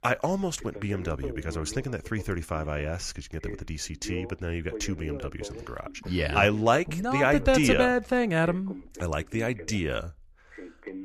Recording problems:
voice in the background; noticeable; throughout; 15 dB below the speech

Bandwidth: 14.5 kHz